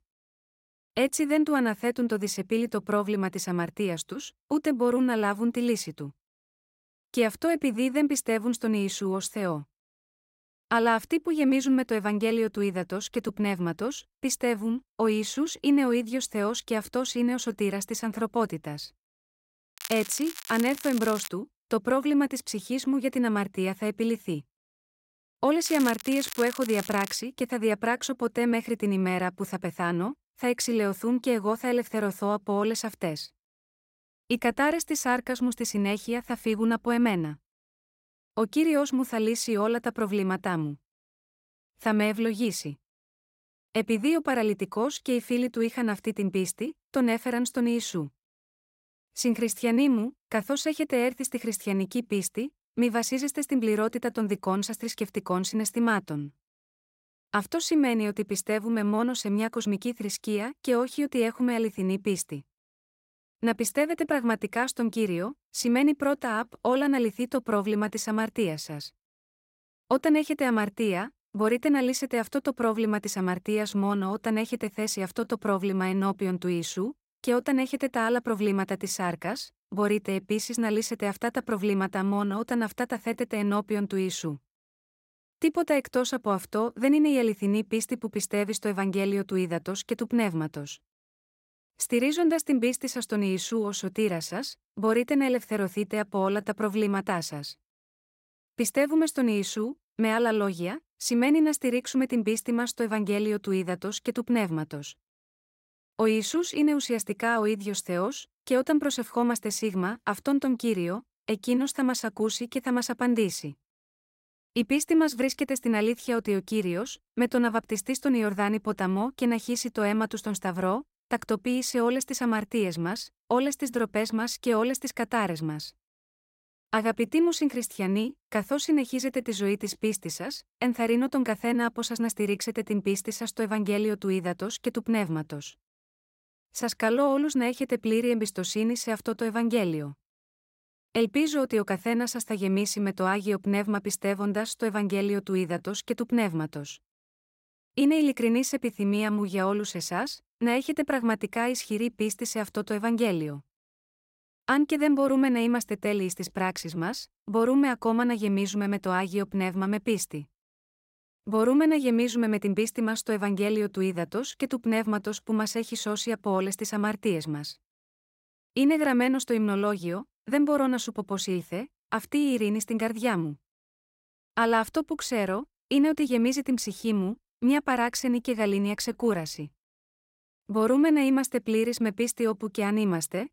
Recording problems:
crackling; noticeable; from 20 to 21 s and from 26 to 27 s; 10 dB below the speech

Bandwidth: 16 kHz